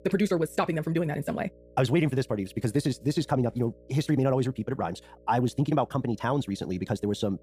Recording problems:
wrong speed, natural pitch; too fast; 1.8 times normal speed
electrical hum; faint; throughout; 60 Hz, 25 dB below the speech

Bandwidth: 15 kHz